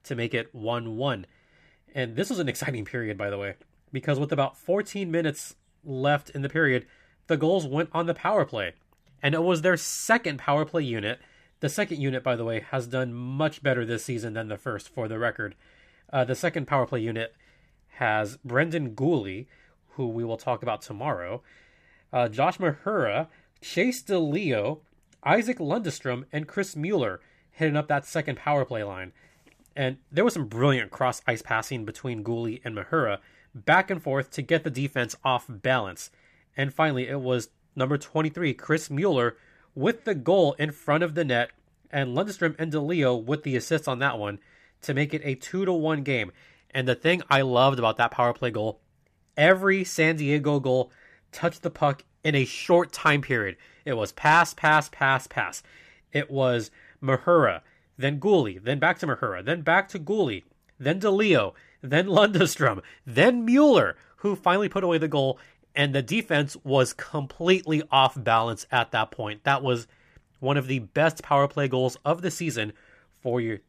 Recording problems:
none

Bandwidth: 14.5 kHz